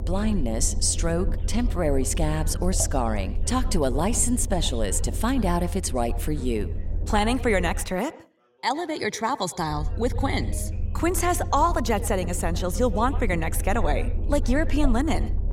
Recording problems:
echo of what is said; faint; throughout; 100 ms later, 20 dB below the speech
low rumble; noticeable; until 8 s and from 9.5 s on; 15 dB below the speech
background chatter; faint; throughout; 2 voices, 30 dB below the speech

